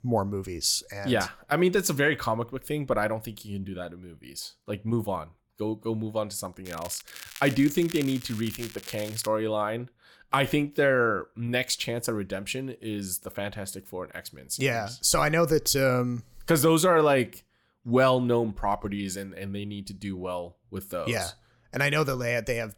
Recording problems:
crackling; noticeable; from 6.5 to 9.5 s; 15 dB below the speech

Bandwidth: 18 kHz